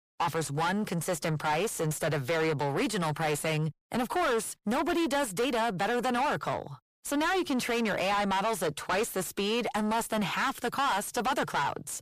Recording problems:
distortion; heavy; 6 dB below the speech

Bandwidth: 15 kHz